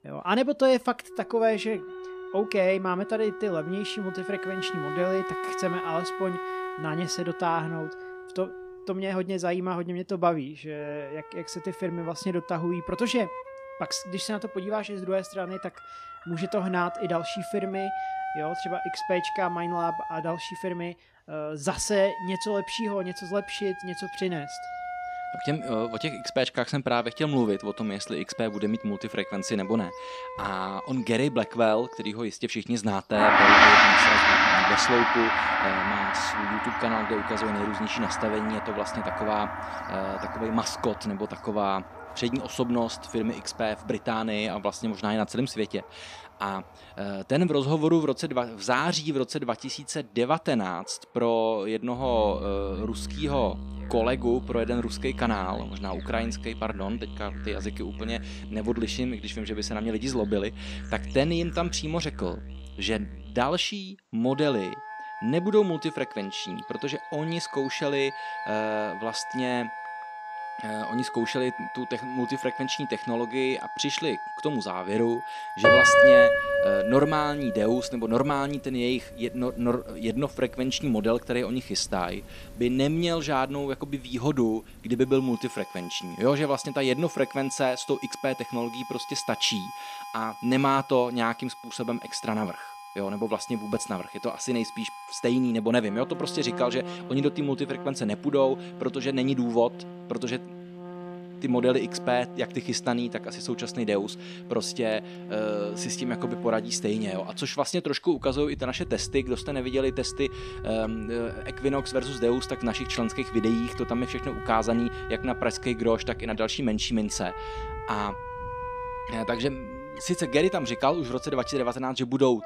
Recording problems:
background music; very loud; throughout; as loud as the speech
animal sounds; faint; throughout; 20 dB below the speech

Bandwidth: 14.5 kHz